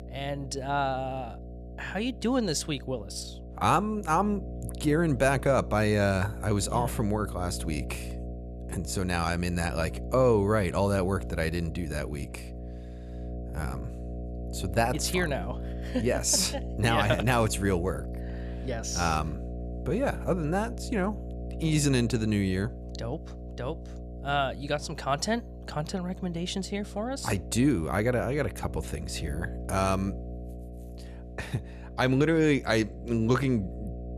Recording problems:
electrical hum; noticeable; throughout; 60 Hz, 15 dB below the speech

